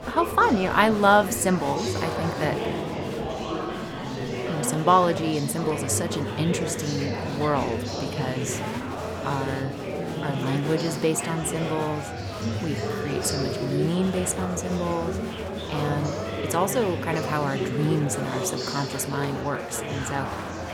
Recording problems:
murmuring crowd; loud; throughout; 4 dB below the speech

